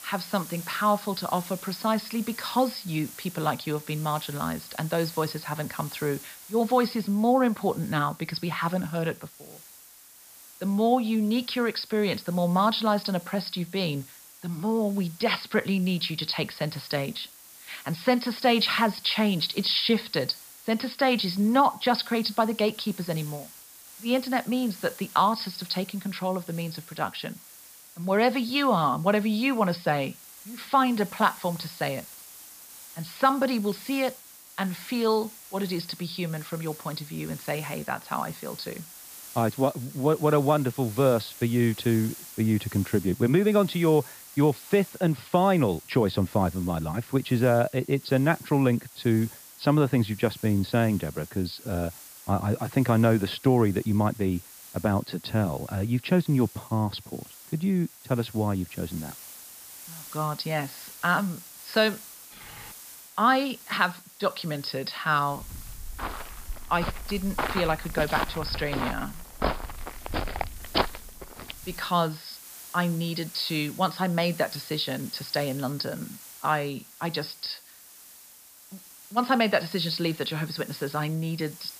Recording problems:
high frequencies cut off; noticeable; nothing above 5.5 kHz
hiss; noticeable; throughout; 15 dB below the speech
keyboard typing; faint; at 1:02; peak 20 dB below the speech
footsteps; noticeable; from 1:05 to 1:12; peak 1 dB below the speech

